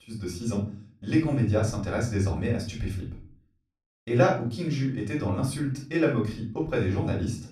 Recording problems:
off-mic speech; far
room echo; slight; dies away in 0.4 s

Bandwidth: 13.5 kHz